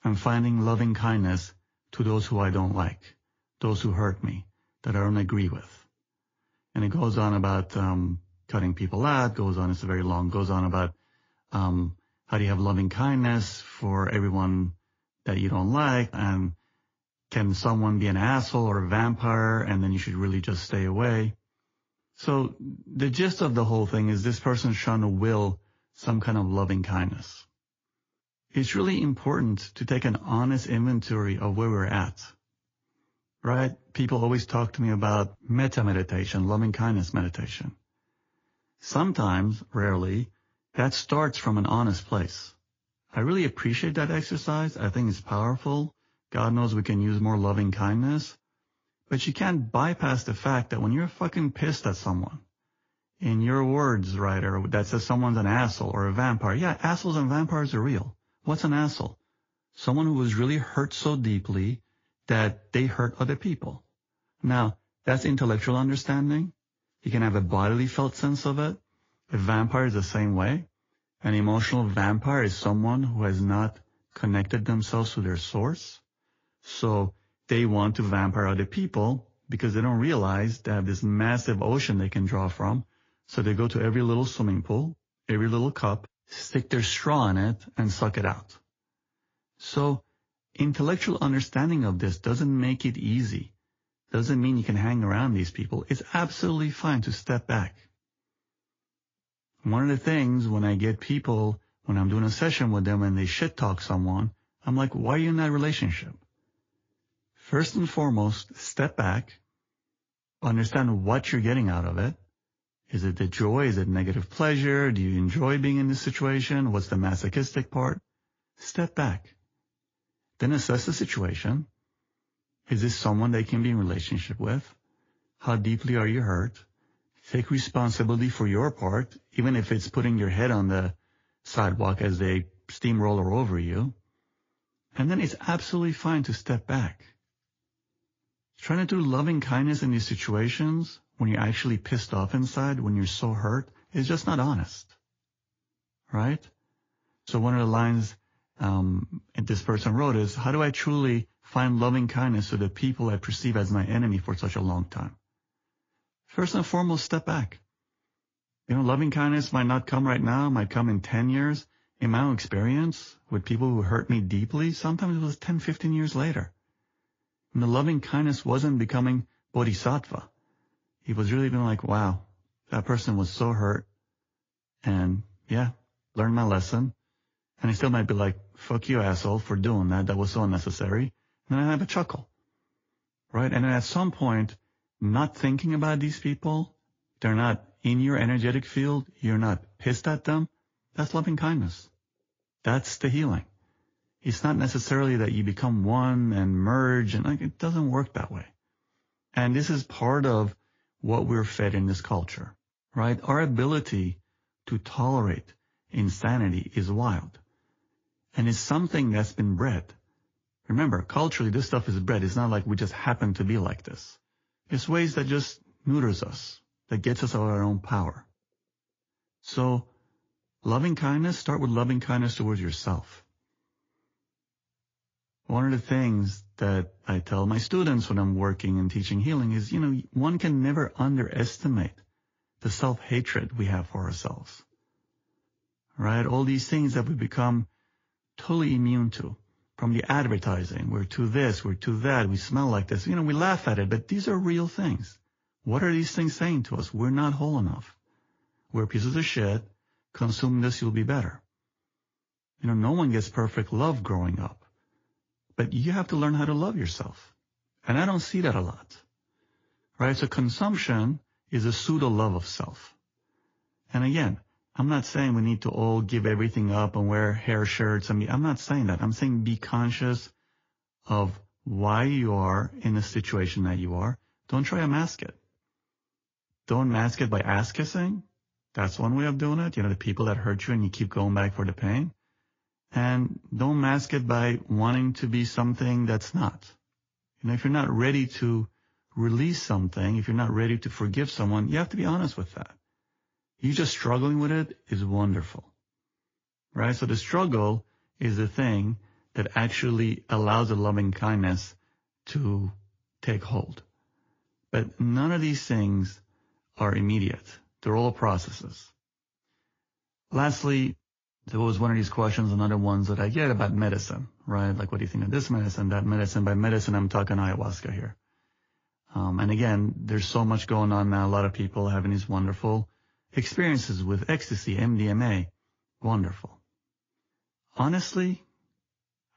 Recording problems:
garbled, watery; slightly

